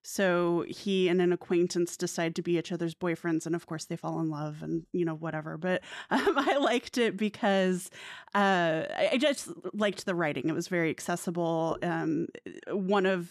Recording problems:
none

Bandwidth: 13.5 kHz